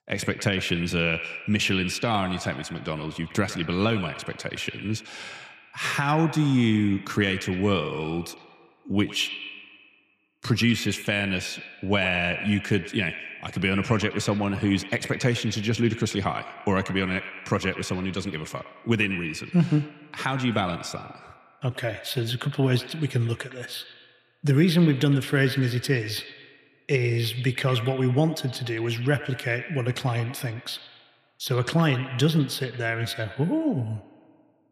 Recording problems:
echo of what is said; noticeable; throughout; 110 ms later, 10 dB below the speech

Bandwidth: 14.5 kHz